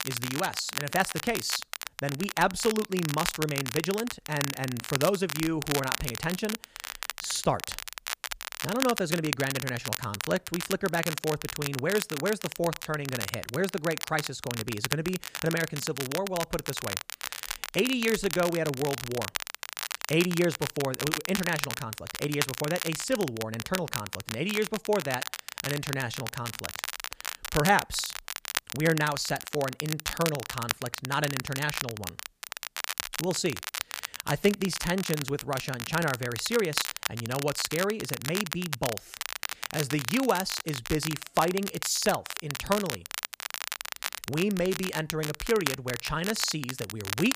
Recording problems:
crackle, like an old record; loud; 4 dB below the speech

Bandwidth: 15 kHz